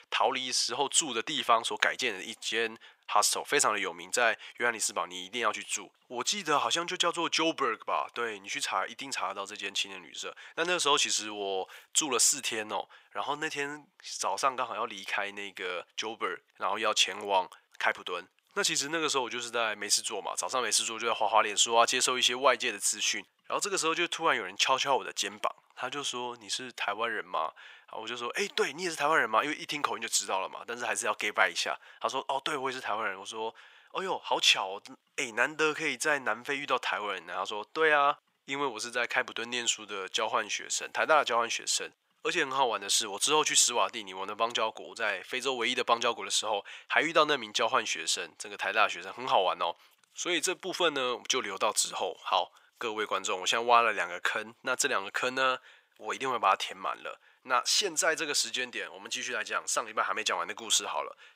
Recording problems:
thin; very; fading below 950 Hz

